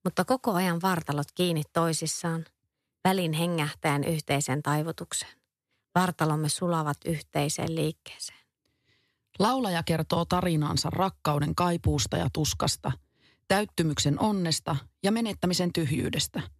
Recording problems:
none

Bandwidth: 14.5 kHz